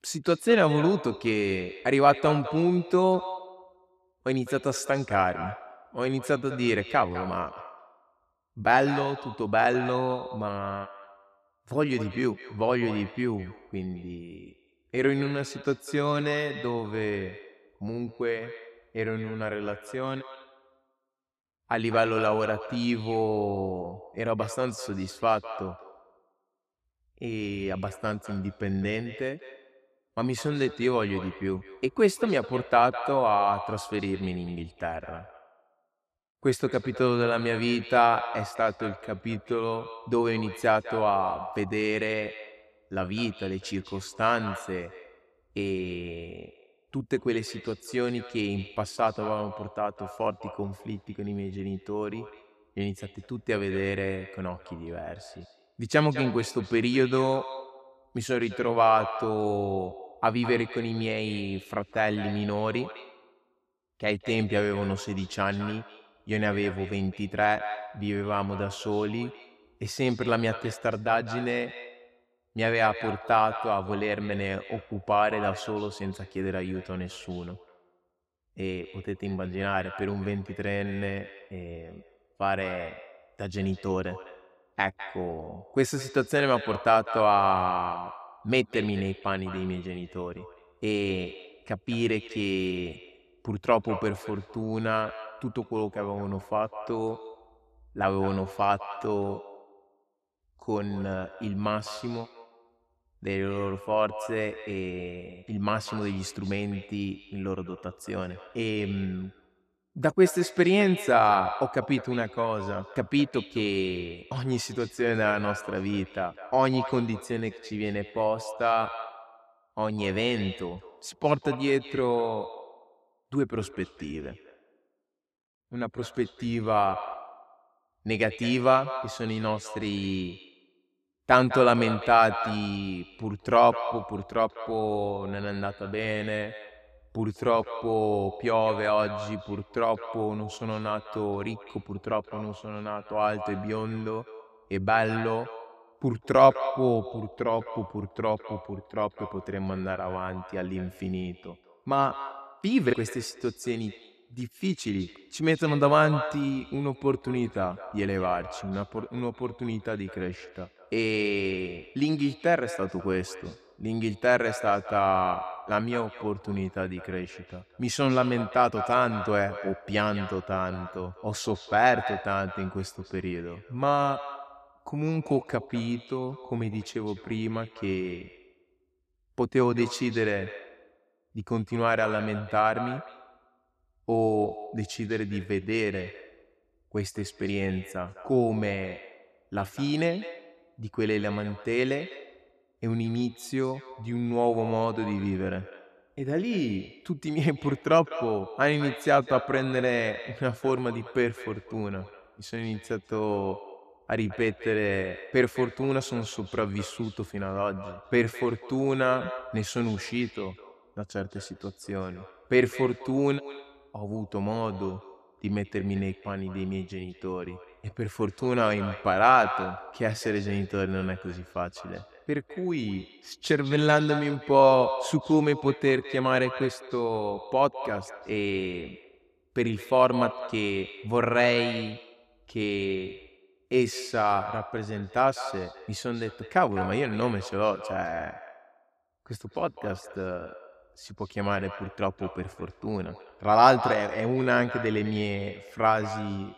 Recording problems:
echo of what is said; noticeable; throughout; 200 ms later, 15 dB below the speech

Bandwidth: 14.5 kHz